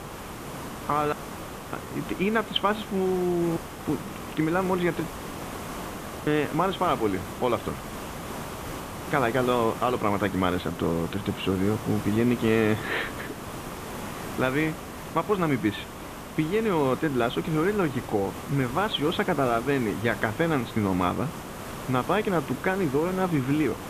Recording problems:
high frequencies cut off; severe; nothing above 4 kHz
hiss; noticeable; throughout; 10 dB below the speech
audio cutting out; at 1 s for 0.5 s, at 3.5 s and at 5 s for 1 s

